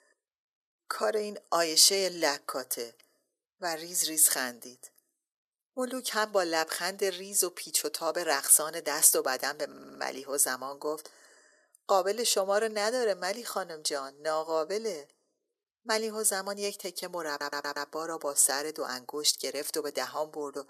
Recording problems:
thin; very; fading below 350 Hz
audio stuttering; at 9.5 s and at 17 s

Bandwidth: 14 kHz